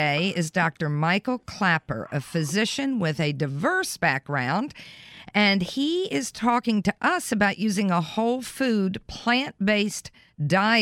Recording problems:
abrupt cut into speech; at the start and the end

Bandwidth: 16 kHz